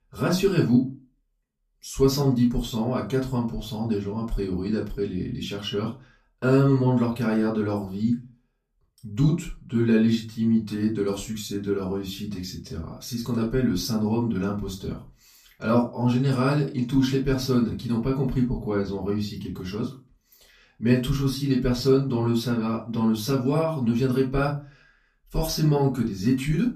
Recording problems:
off-mic speech; far
room echo; slight; dies away in 0.2 s

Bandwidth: 14.5 kHz